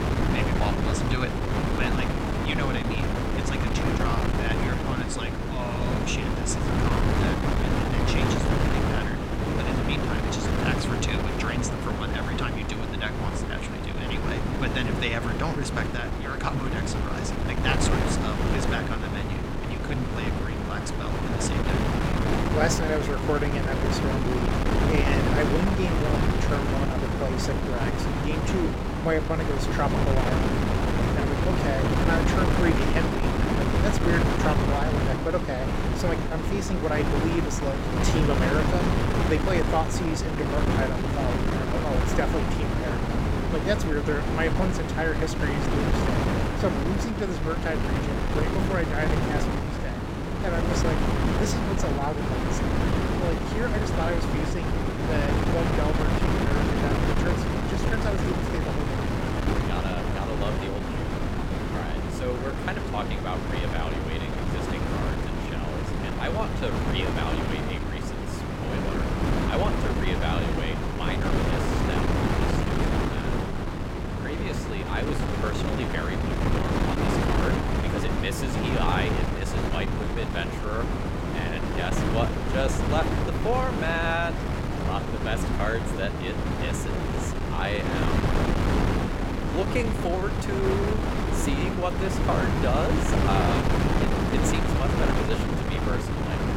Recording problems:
wind noise on the microphone; heavy; 2 dB above the speech

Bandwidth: 16.5 kHz